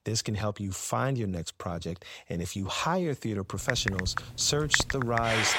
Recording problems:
household noises; loud; from 3.5 s on; 1 dB below the speech

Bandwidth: 16 kHz